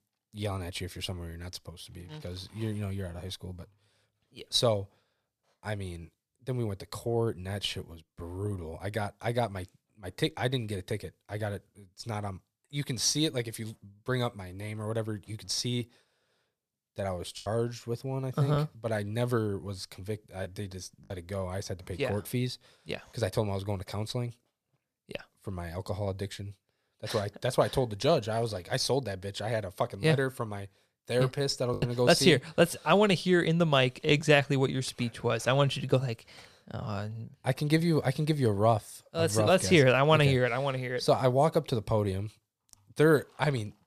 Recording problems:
choppy; very; from 17 to 21 s and at 32 s; 6% of the speech affected

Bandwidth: 14.5 kHz